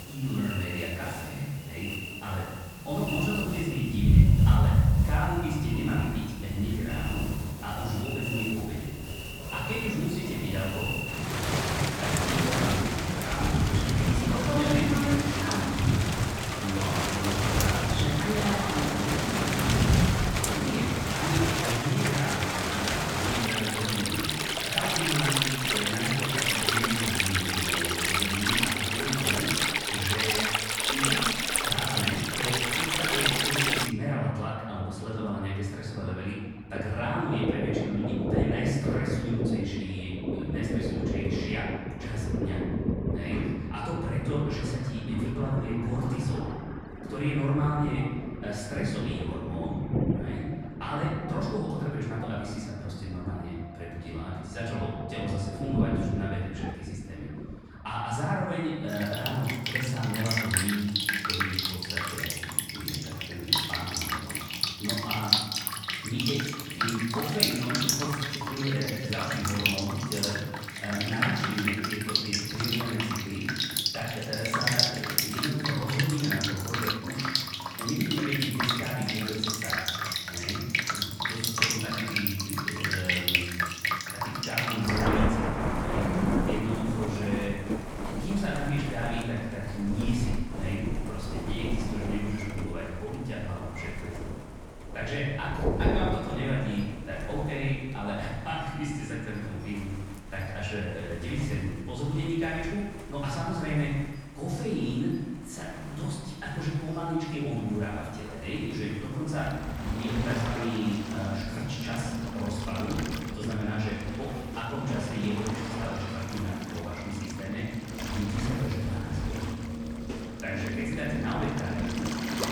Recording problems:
off-mic speech; far
room echo; noticeable; dies away in 1.2 s
rain or running water; very loud; throughout; 3 dB above the speech
uneven, jittery; strongly; from 21 s to 1:36

